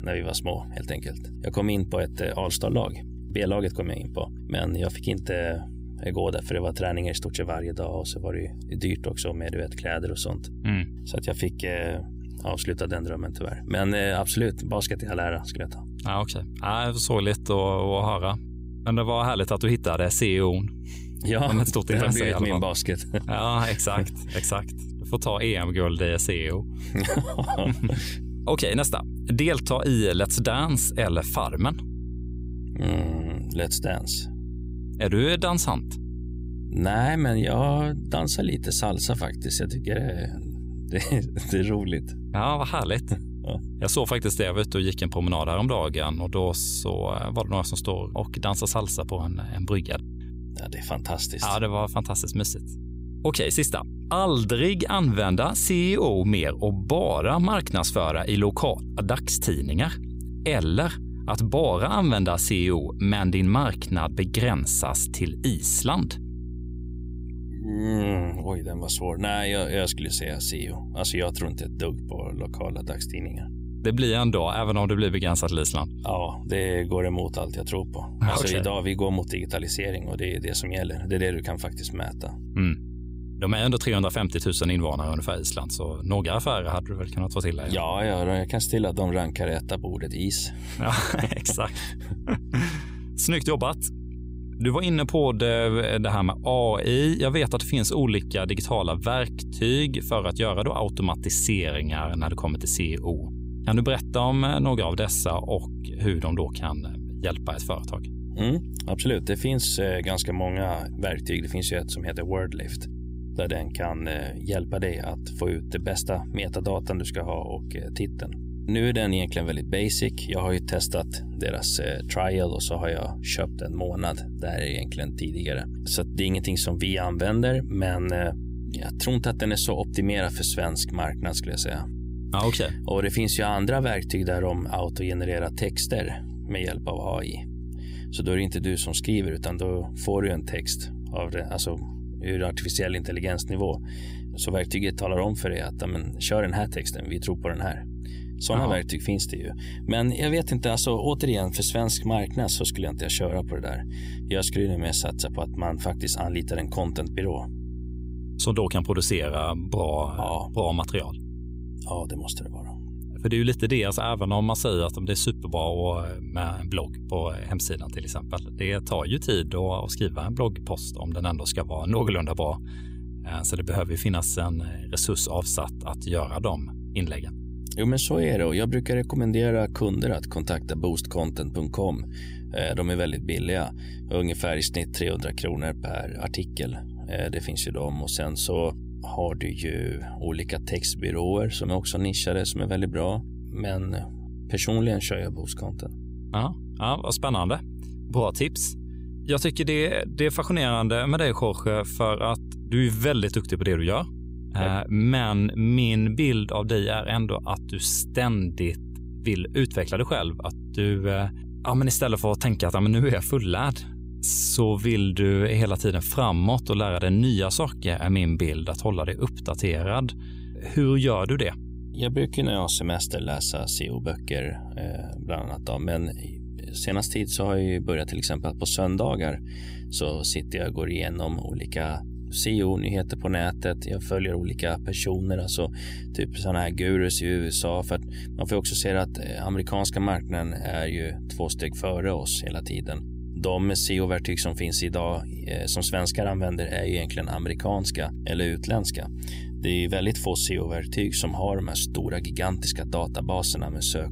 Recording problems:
electrical hum; noticeable; throughout; 60 Hz, 20 dB below the speech

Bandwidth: 15.5 kHz